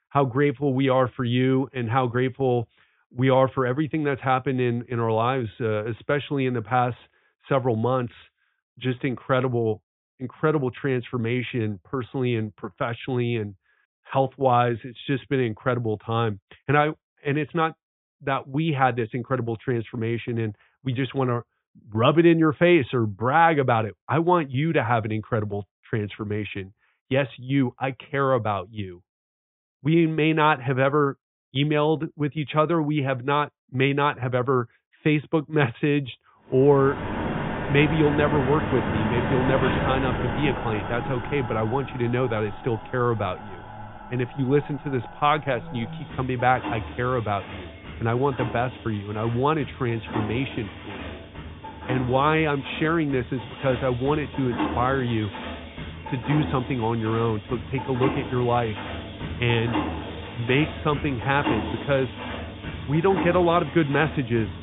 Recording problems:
high frequencies cut off; severe; nothing above 3.5 kHz
machinery noise; loud; from 37 s on; 8 dB below the speech

